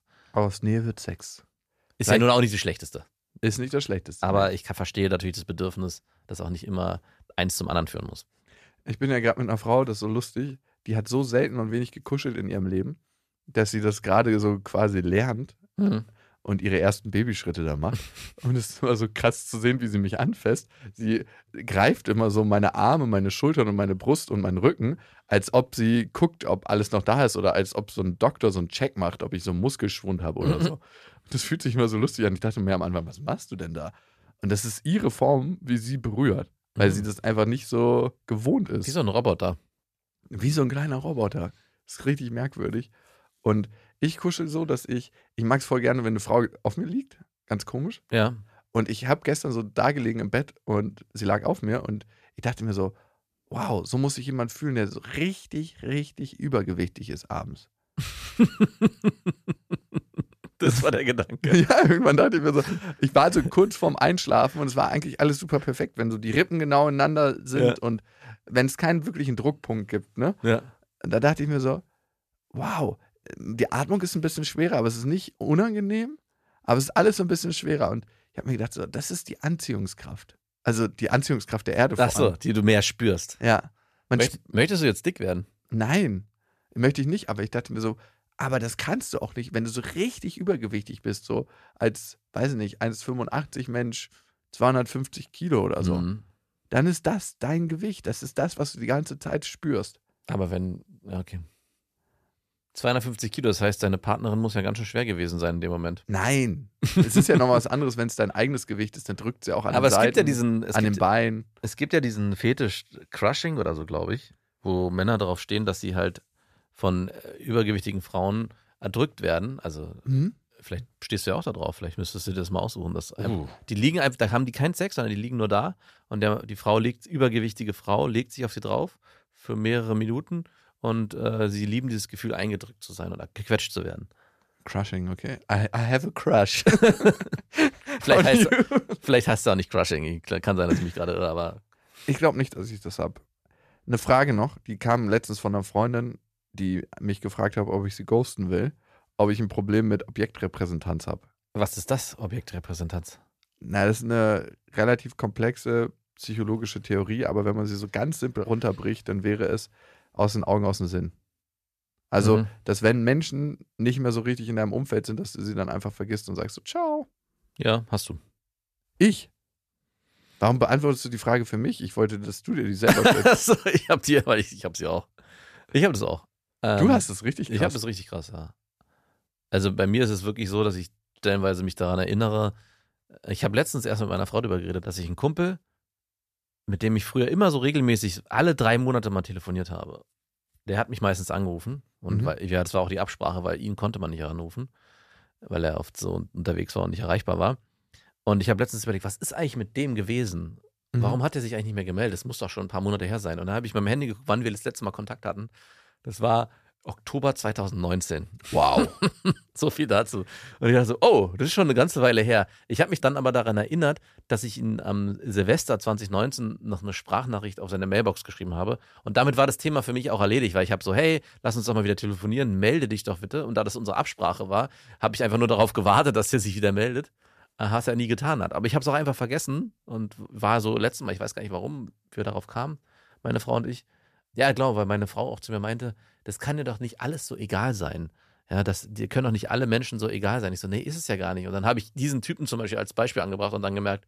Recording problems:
none

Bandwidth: 14.5 kHz